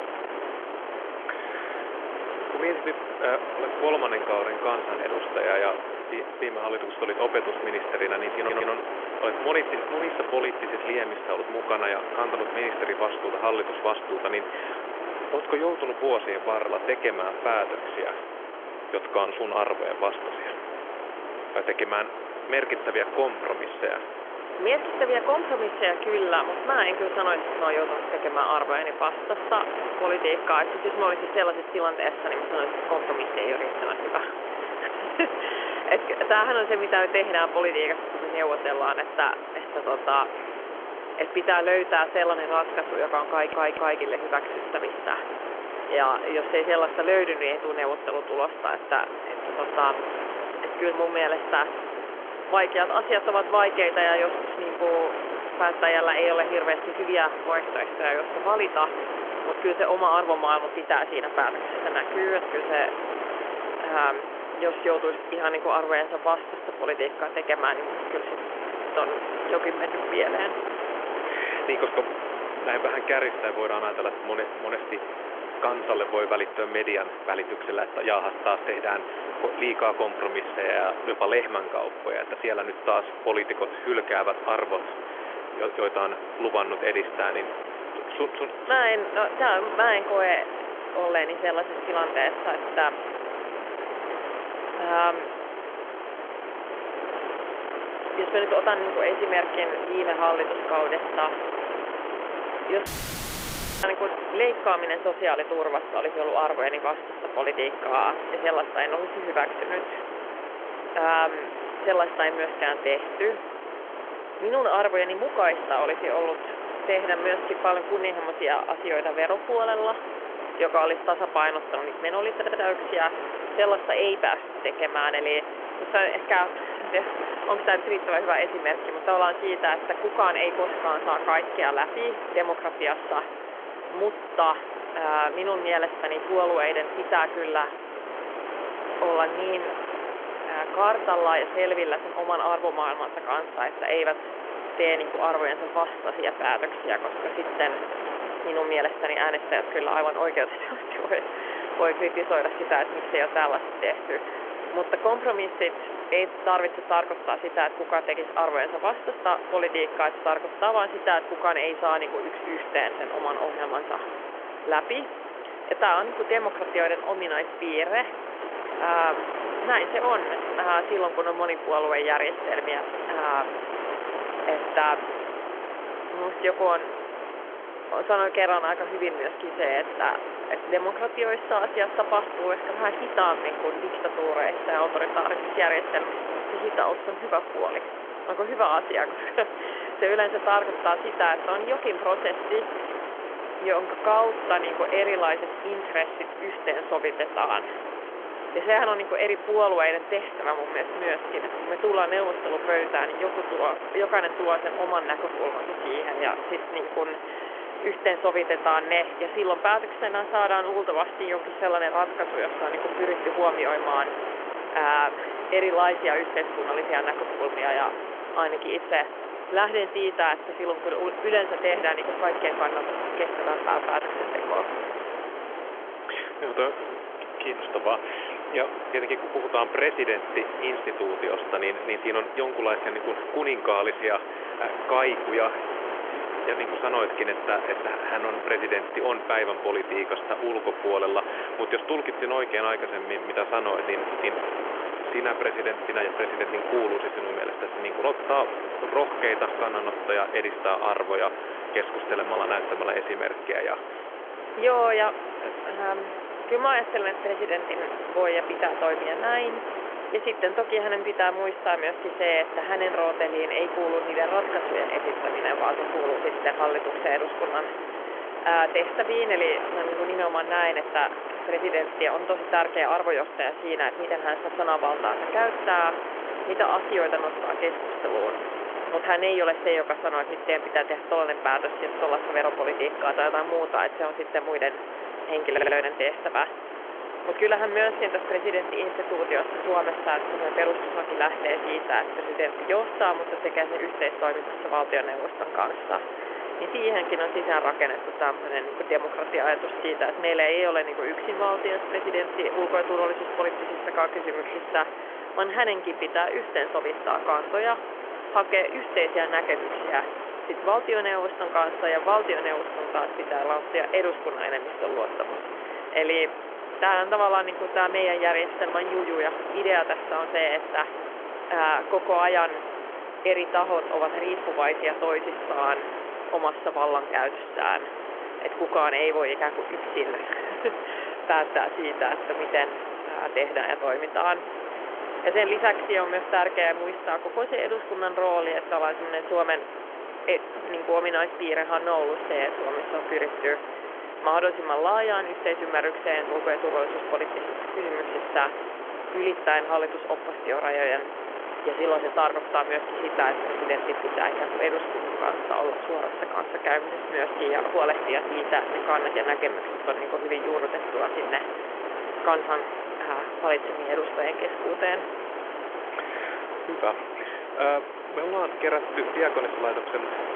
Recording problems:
phone-call audio; nothing above 3.5 kHz
wind noise on the microphone; heavy; 7 dB below the speech
audio stuttering; 4 times, first at 8.5 s
audio cutting out; filled with static; at 1:43 for 1 s

